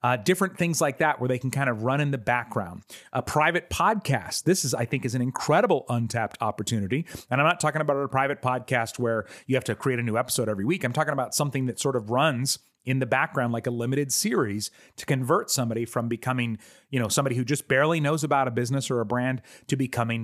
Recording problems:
abrupt cut into speech; at the end

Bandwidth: 15 kHz